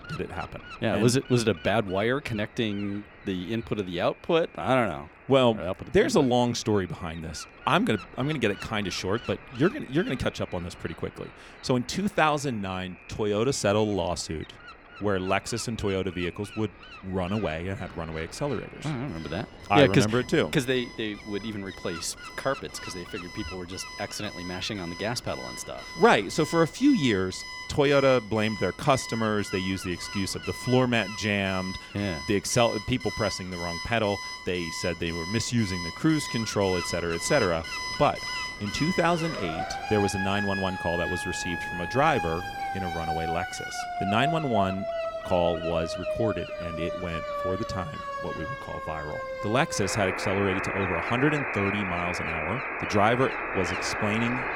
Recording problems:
alarms or sirens; loud; throughout; 6 dB below the speech
wind noise on the microphone; occasional gusts; 15 dB below the speech

